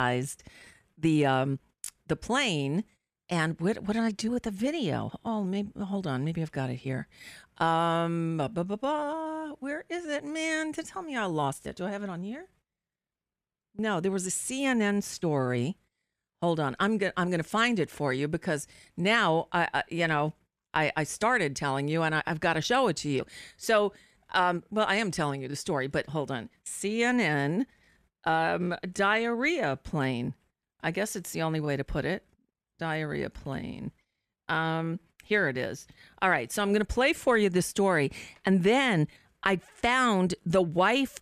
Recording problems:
abrupt cut into speech; at the start

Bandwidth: 14.5 kHz